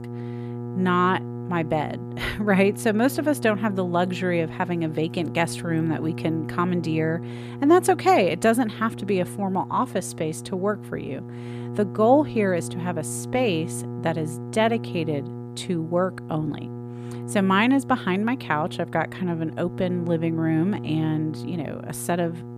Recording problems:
electrical hum; noticeable; throughout; 60 Hz, 15 dB below the speech

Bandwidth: 14.5 kHz